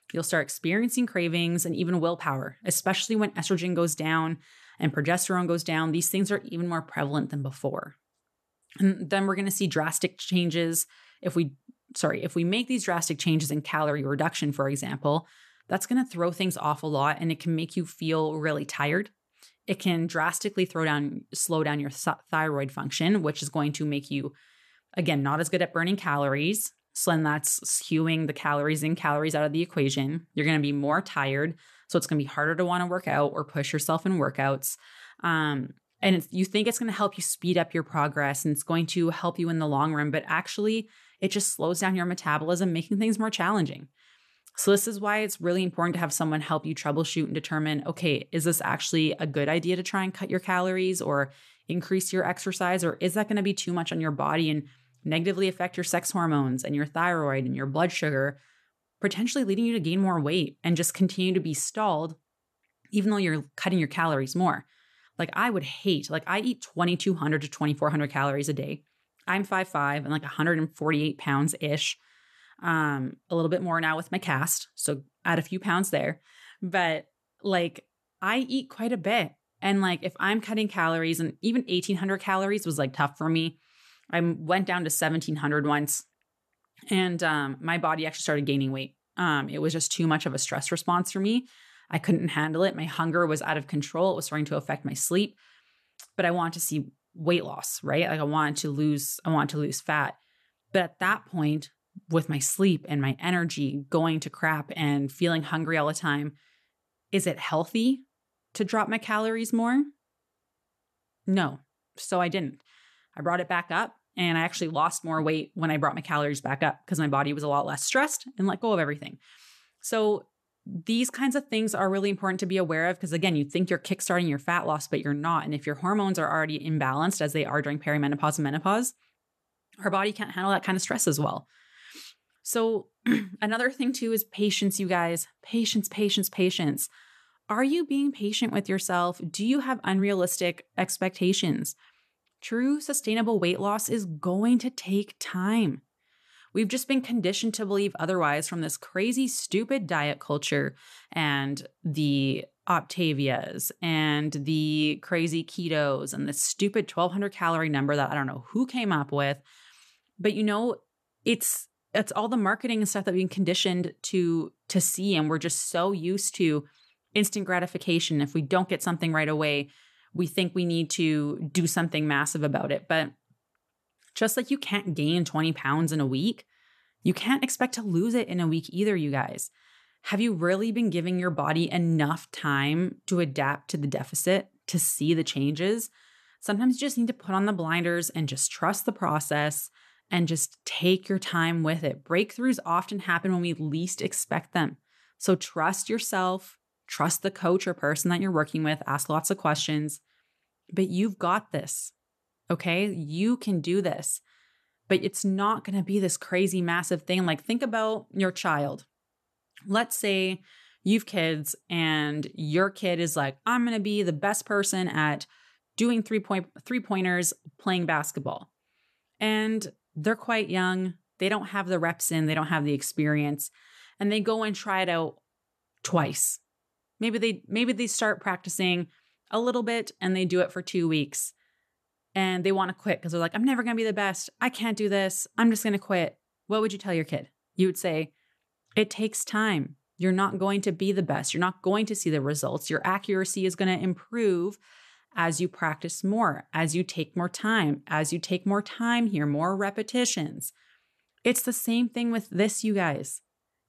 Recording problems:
none

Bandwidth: 13.5 kHz